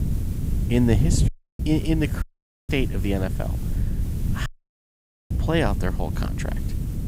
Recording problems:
wind noise on the microphone; occasional gusts; 10 dB below the speech
hiss; faint; throughout; 20 dB below the speech
audio cutting out; at 1.5 s, at 2 s and at 4.5 s for 1 s

